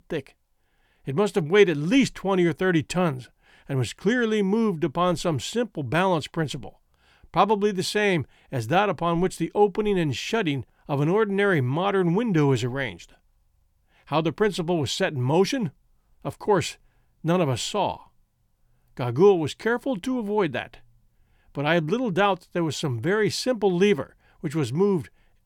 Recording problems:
none

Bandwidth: 18.5 kHz